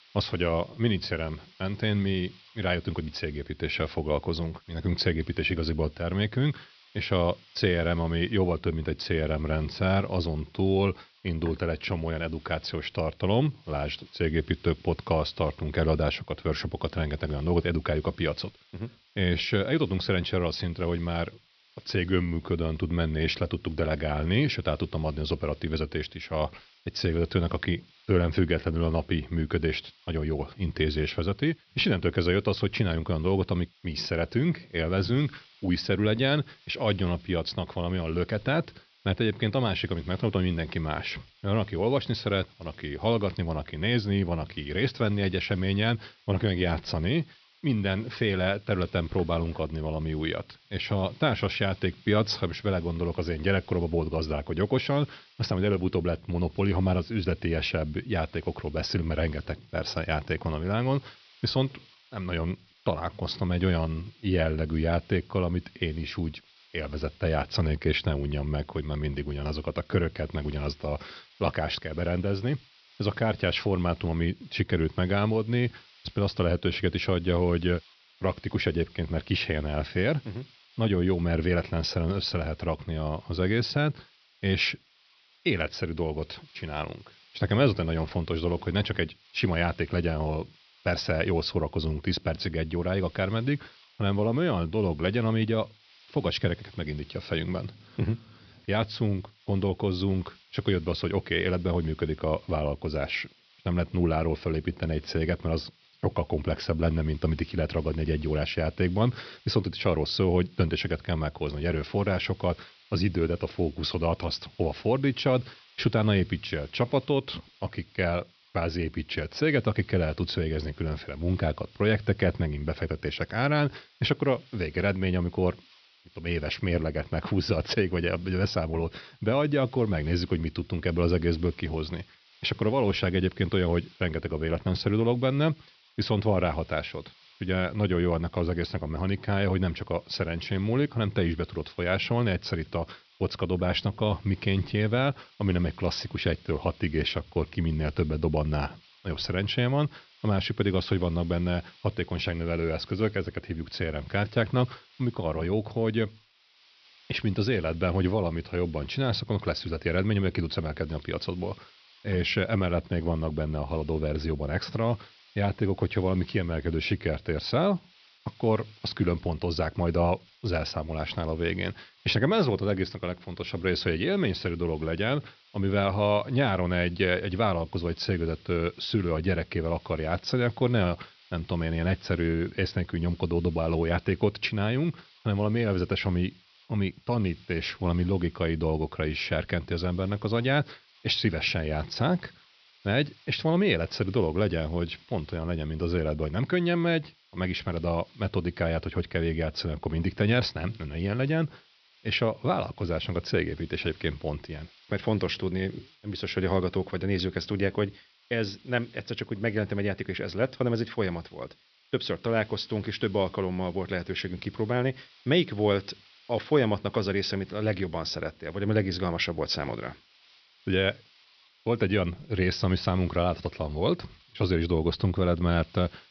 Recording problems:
high frequencies cut off; noticeable; nothing above 5.5 kHz
hiss; faint; throughout; 30 dB below the speech

